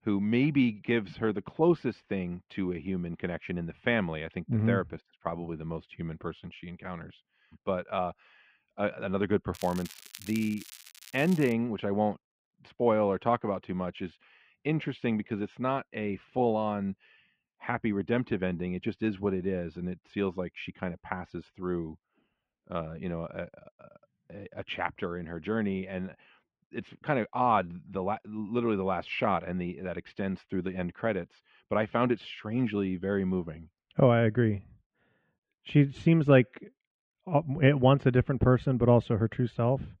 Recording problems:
muffled; very; fading above 3 kHz
crackling; noticeable; from 9.5 to 12 s; 15 dB below the speech

